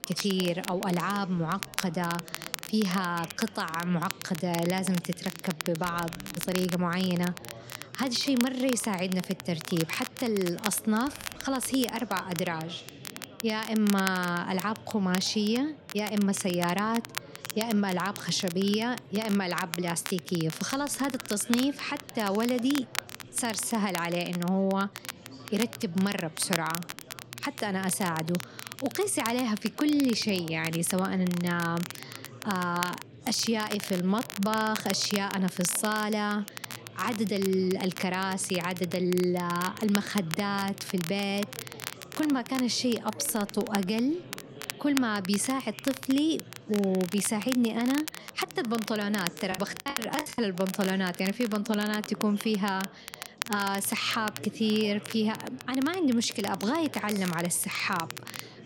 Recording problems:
chatter from many people; noticeable; throughout; 20 dB below the speech
crackle, like an old record; noticeable; 10 dB below the speech
choppy; very; at 50 s; 27% of the speech affected

